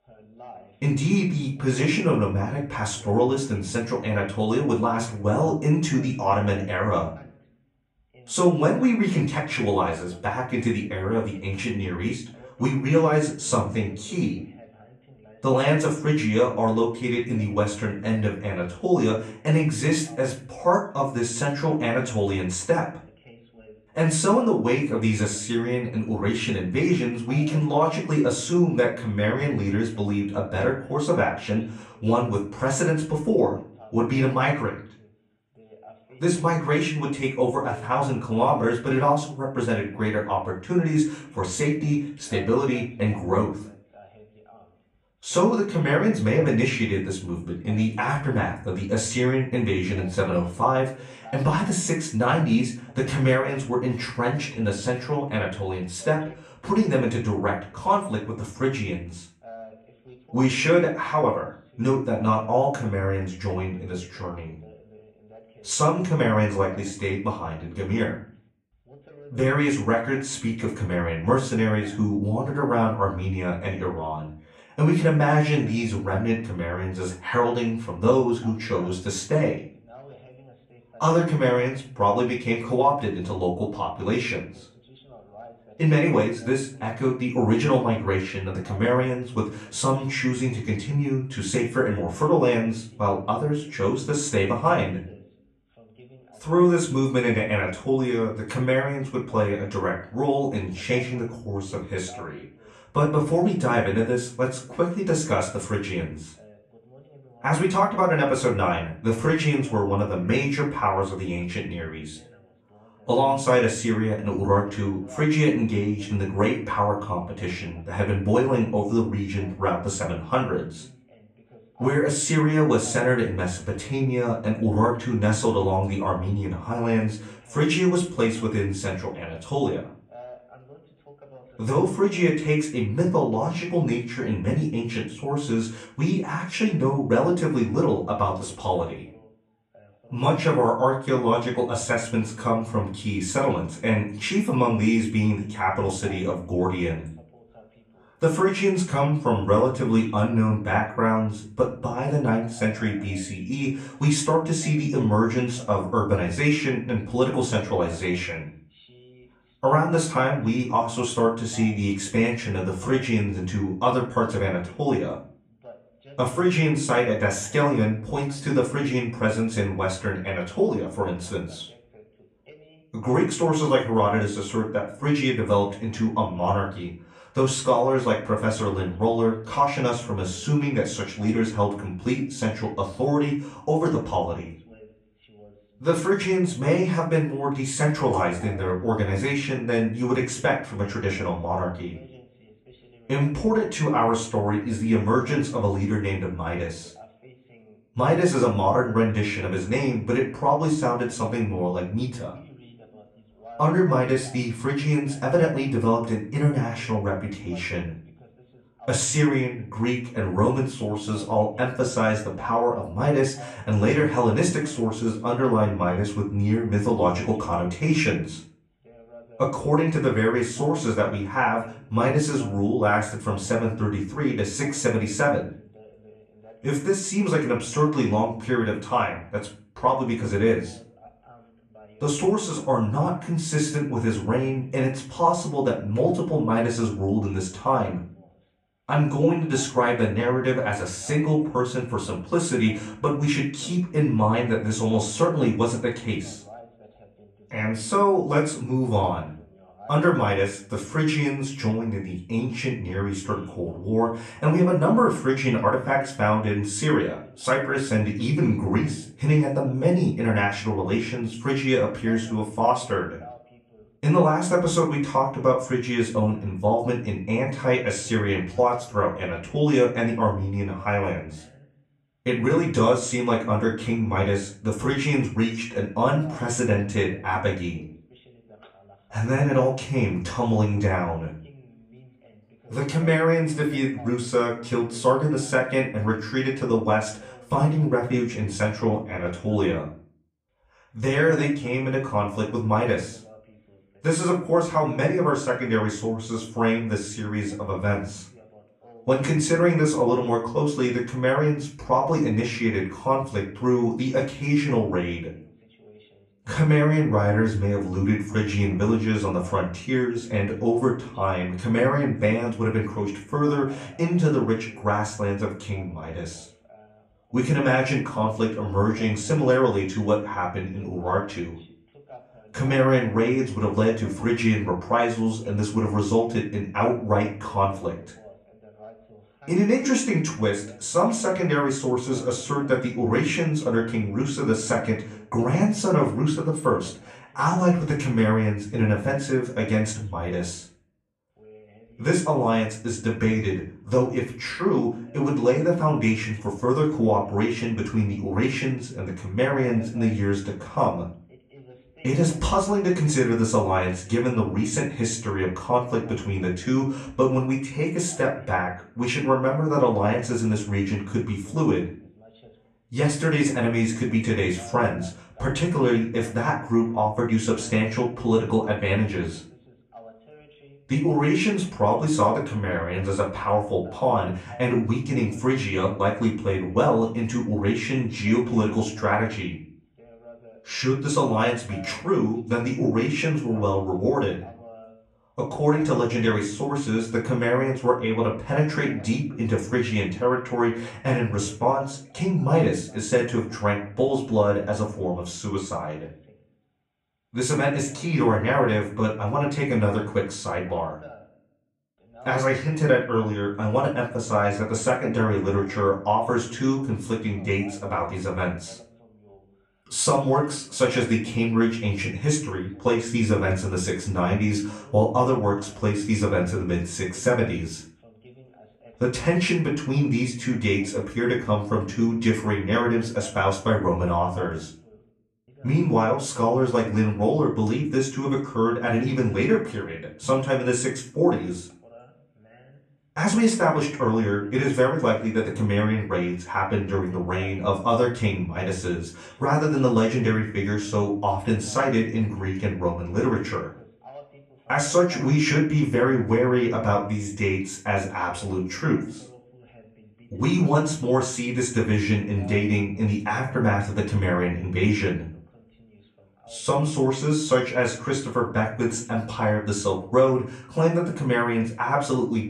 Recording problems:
off-mic speech; far
room echo; slight; dies away in 0.4 s
voice in the background; faint; throughout; 25 dB below the speech

